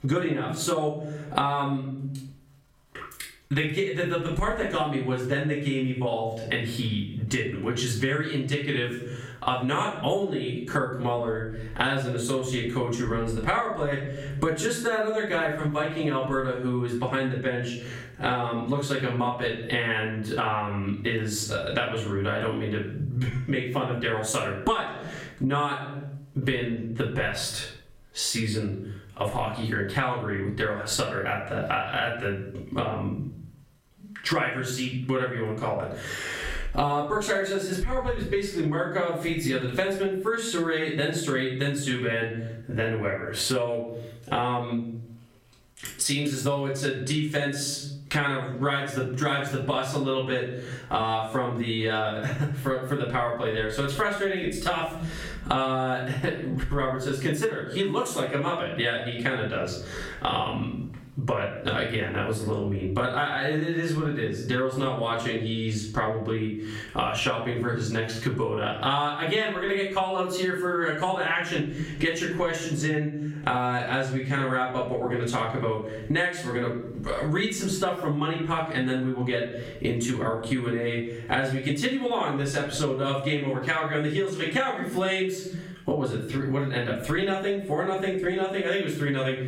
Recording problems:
off-mic speech; far
squashed, flat; heavily
room echo; slight; dies away in 0.5 s

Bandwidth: 16 kHz